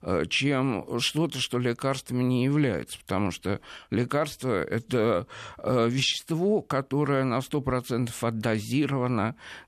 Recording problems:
none

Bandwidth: 14 kHz